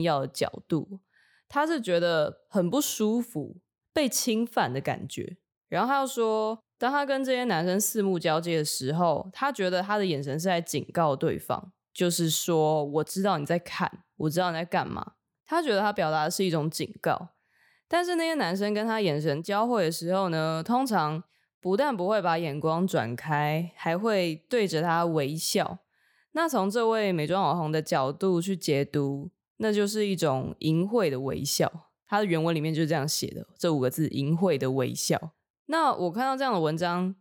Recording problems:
abrupt cut into speech; at the start

